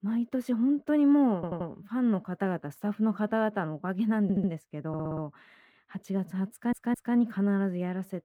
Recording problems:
muffled; slightly; fading above 3 kHz
audio stuttering; 4 times, first at 1.5 s

